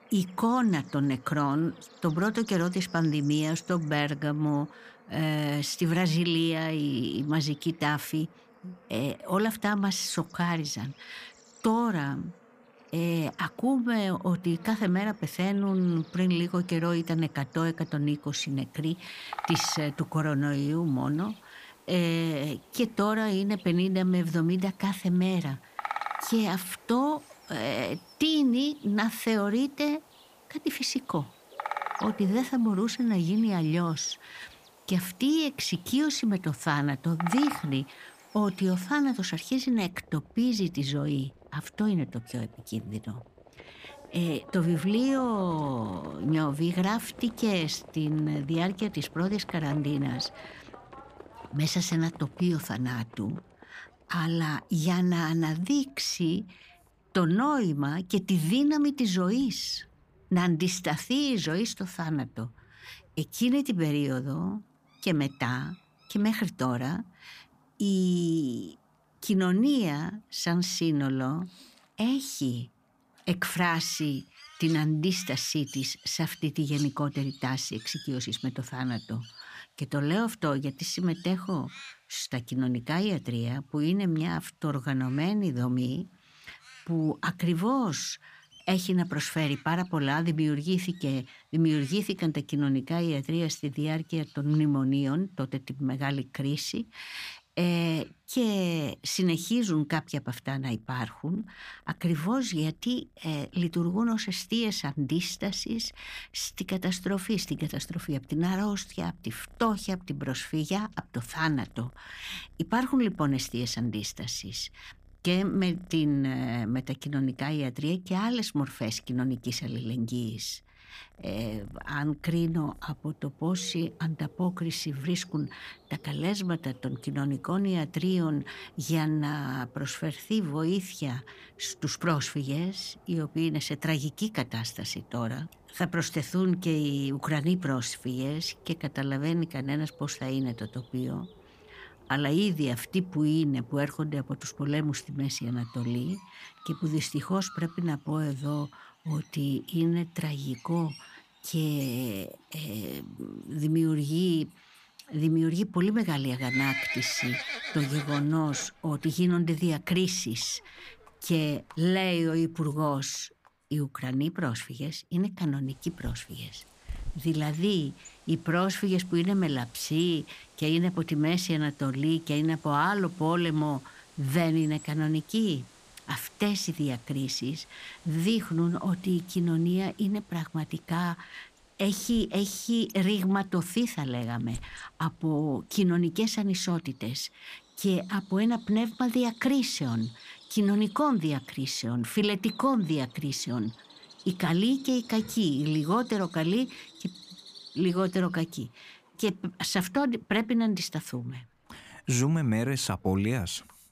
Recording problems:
animal sounds; noticeable; throughout; 15 dB below the speech

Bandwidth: 15 kHz